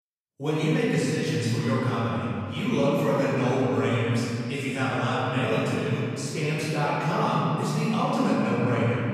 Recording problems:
room echo; strong; dies away in 2.5 s
off-mic speech; far

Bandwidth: 14.5 kHz